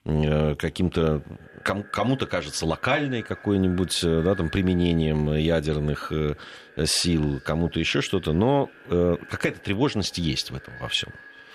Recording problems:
echo of what is said; faint; throughout; 390 ms later, 20 dB below the speech

